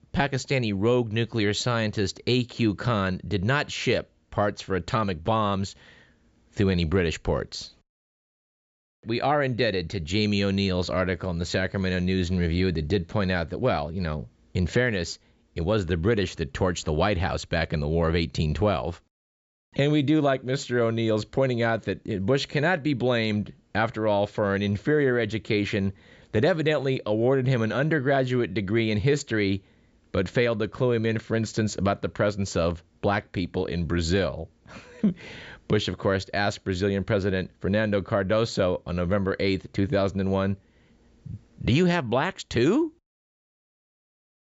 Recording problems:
high frequencies cut off; noticeable; nothing above 8 kHz

